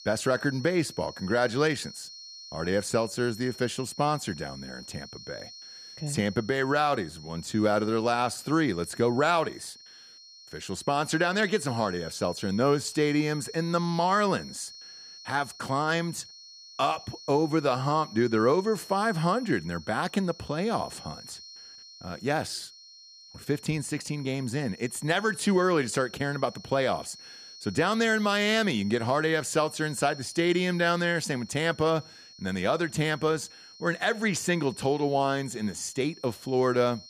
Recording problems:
high-pitched whine; noticeable; throughout; 4.5 kHz, 15 dB below the speech

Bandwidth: 14.5 kHz